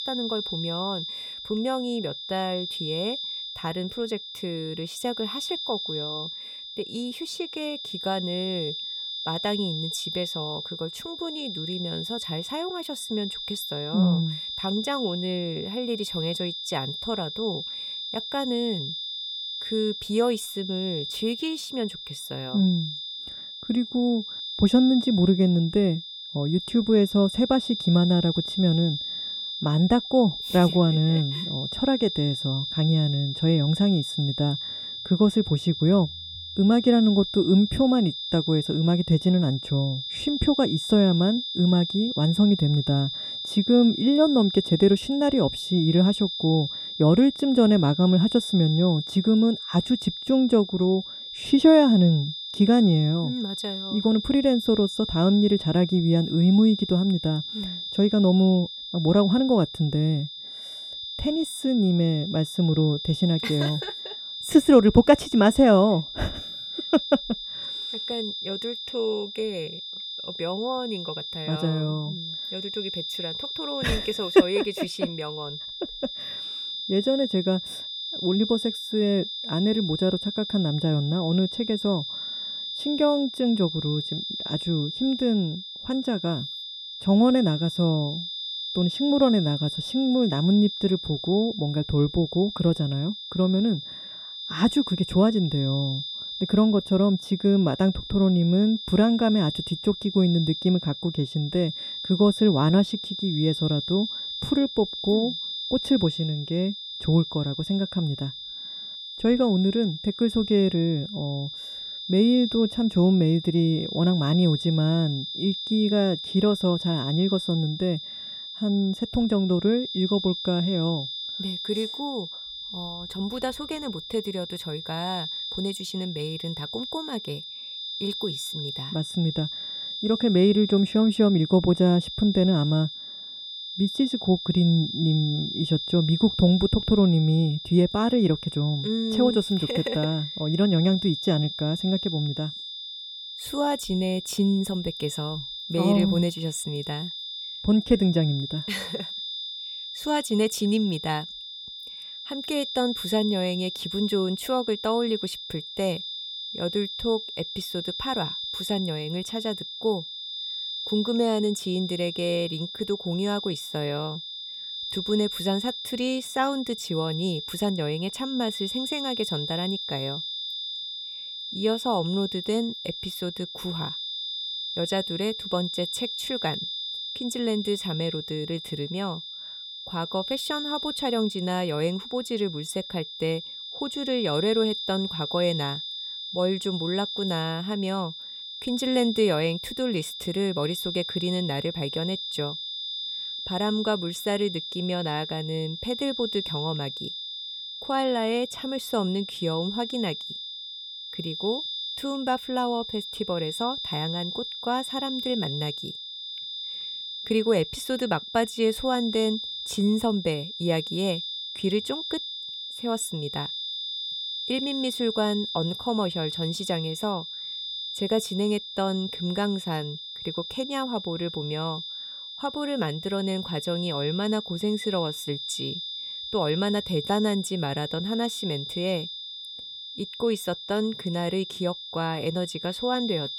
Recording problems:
high-pitched whine; loud; throughout; 3.5 kHz, 7 dB below the speech

